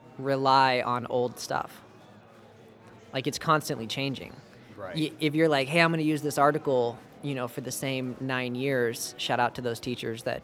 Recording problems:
murmuring crowd; faint; throughout; 25 dB below the speech

